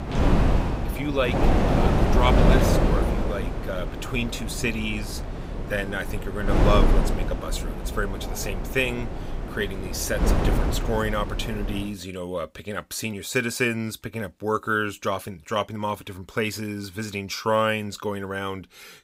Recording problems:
wind noise on the microphone; heavy; until 12 s; 2 dB below the speech

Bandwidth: 15.5 kHz